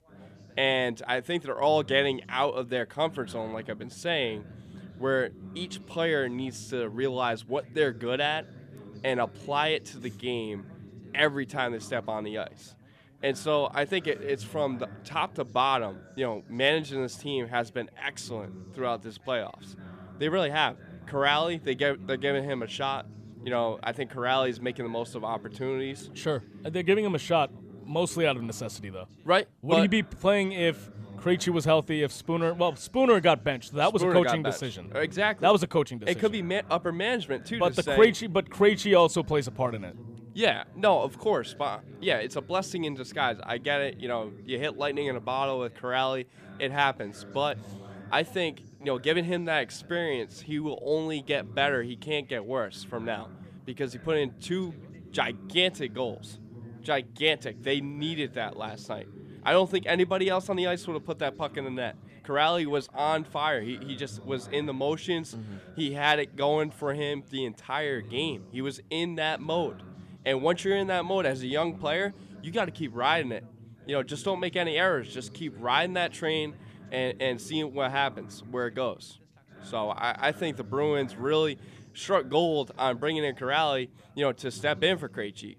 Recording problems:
background chatter; noticeable; throughout; 3 voices, 20 dB below the speech

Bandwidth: 14.5 kHz